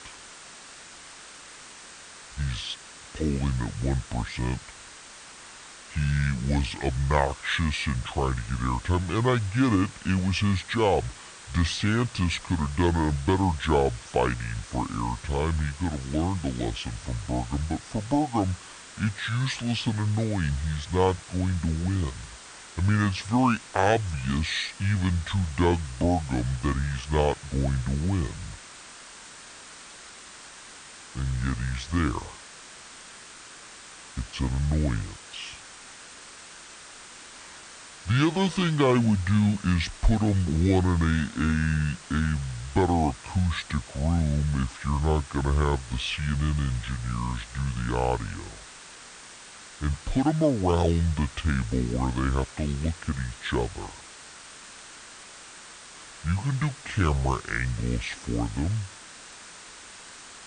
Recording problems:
wrong speed and pitch; too slow and too low; 0.7 times normal speed
hiss; noticeable; throughout; 15 dB below the speech

